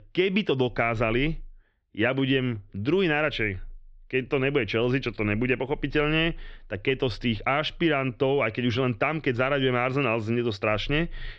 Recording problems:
muffled; slightly; fading above 4 kHz

